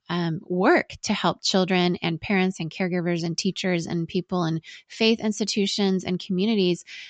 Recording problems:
high frequencies cut off; noticeable; nothing above 8 kHz

